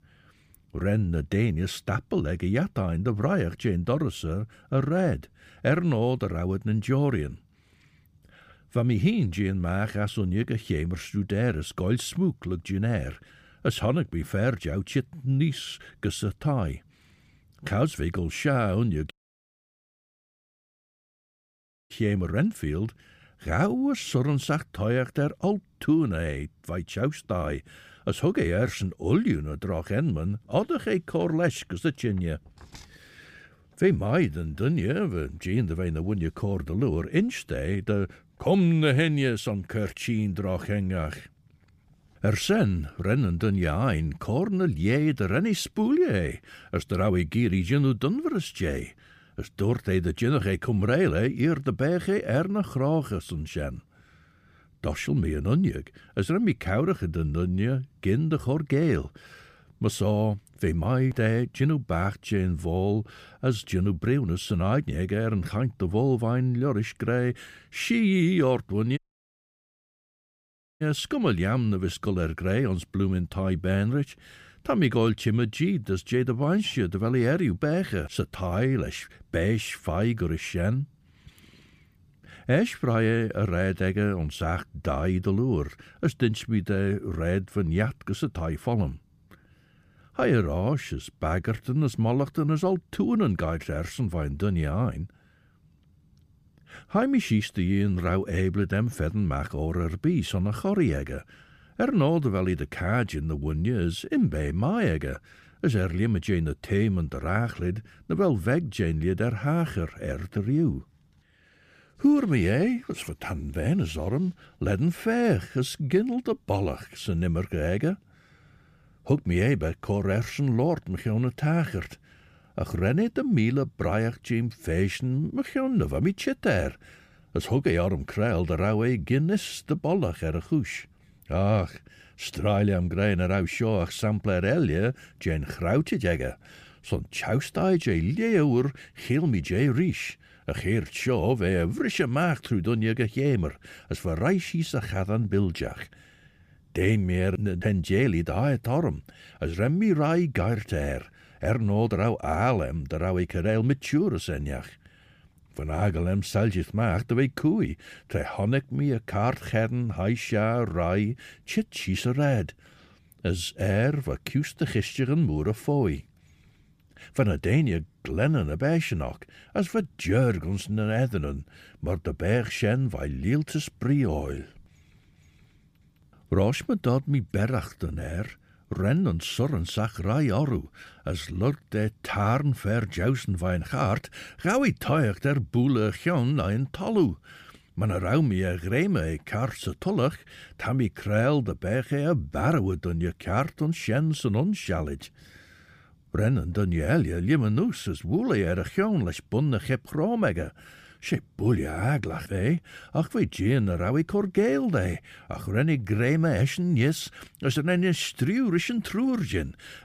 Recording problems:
audio cutting out; at 19 s for 3 s and at 1:09 for 2 s

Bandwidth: 15 kHz